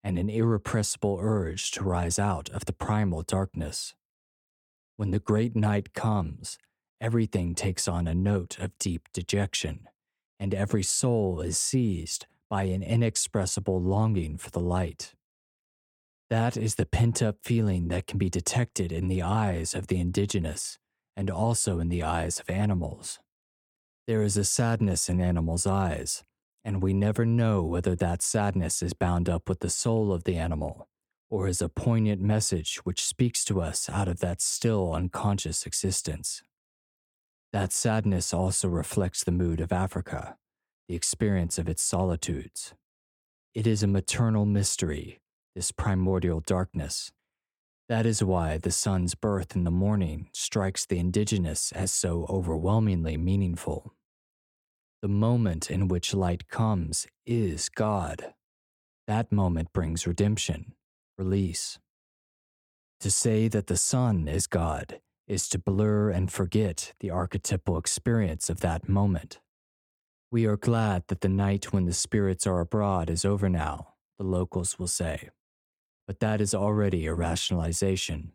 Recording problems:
none

